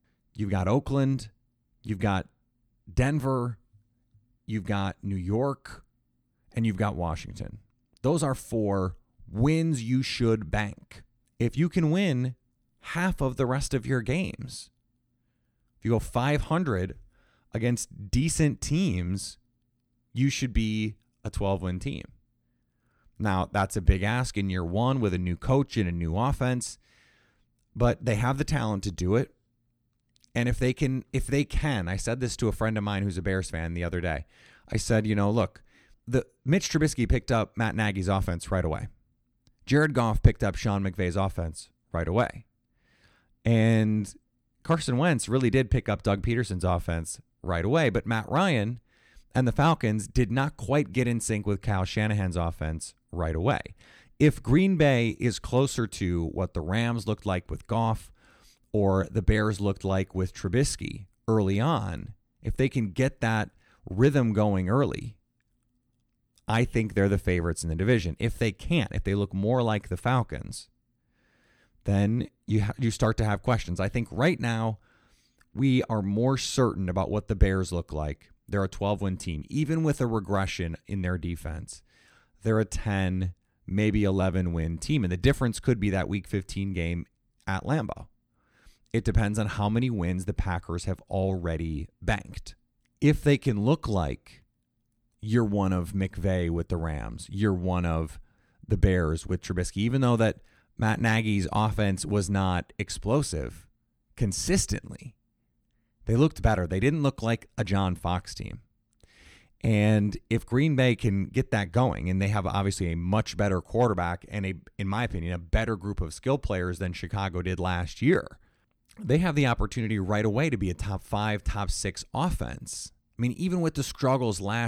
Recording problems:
abrupt cut into speech; at the end

